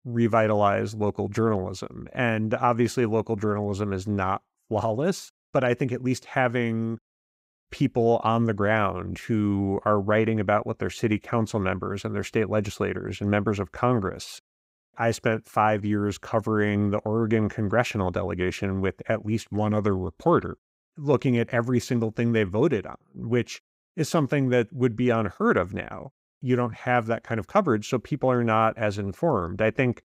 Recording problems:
none

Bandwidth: 15.5 kHz